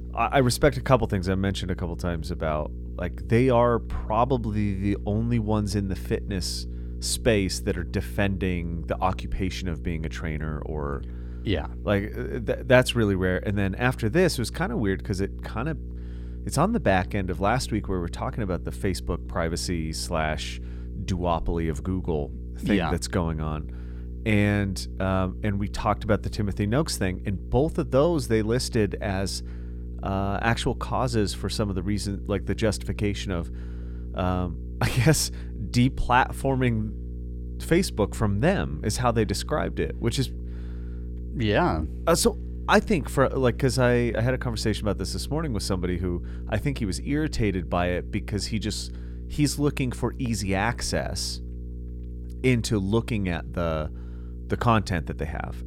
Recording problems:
electrical hum; faint; throughout; 60 Hz, 20 dB below the speech

